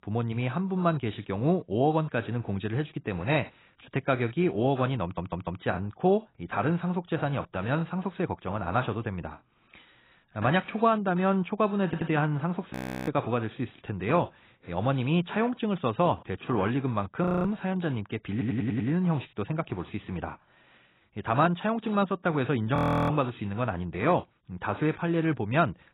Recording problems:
garbled, watery; badly; nothing above 15.5 kHz
audio stuttering; at 5 s, at 12 s and at 18 s
audio freezing; at 13 s, at 17 s and at 23 s

